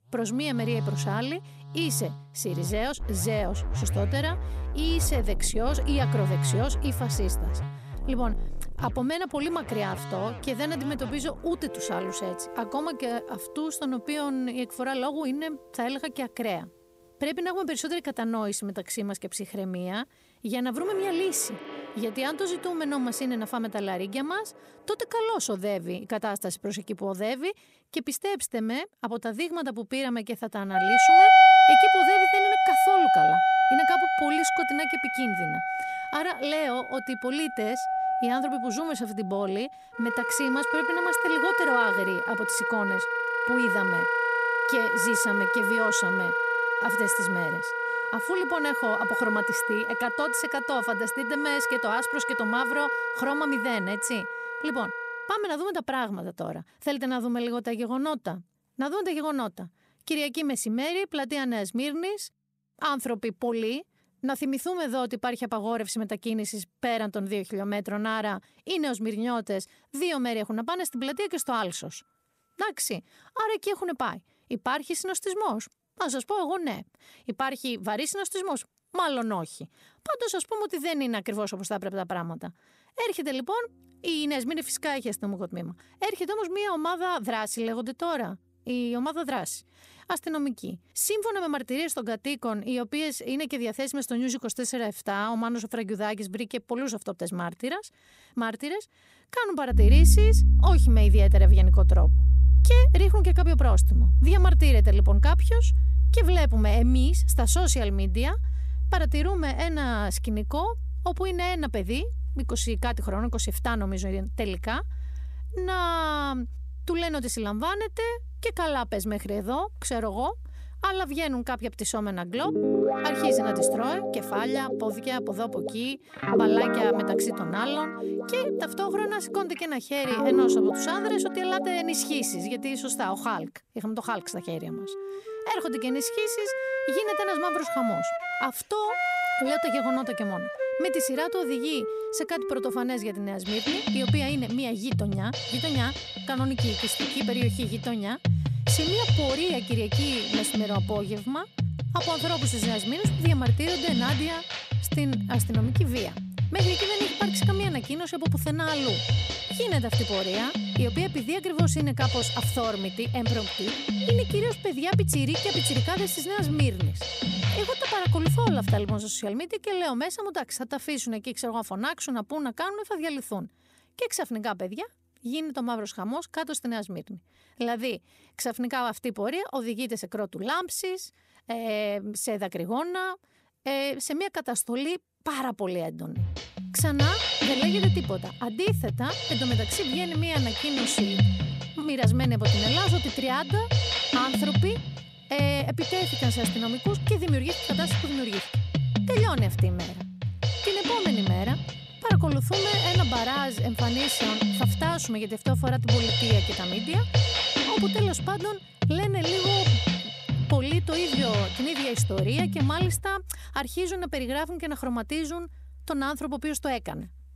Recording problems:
background music; very loud; throughout; 4 dB above the speech

